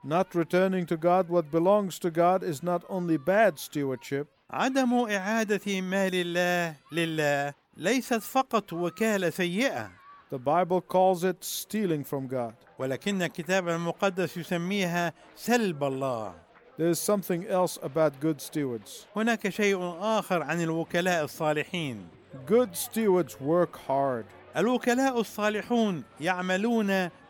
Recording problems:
crowd noise; faint; throughout; 25 dB below the speech

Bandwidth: 17.5 kHz